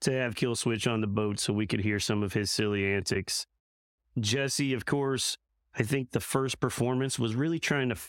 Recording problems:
squashed, flat; heavily

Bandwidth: 16.5 kHz